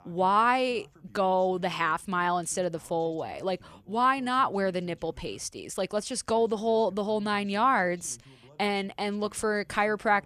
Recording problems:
voice in the background; faint; throughout; 30 dB below the speech

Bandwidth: 14.5 kHz